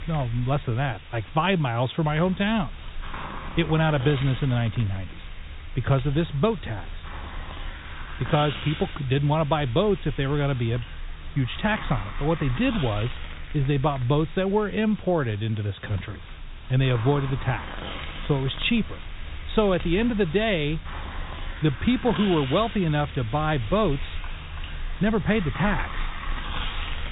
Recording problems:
high frequencies cut off; severe; nothing above 4 kHz
hiss; noticeable; throughout; 10 dB below the speech

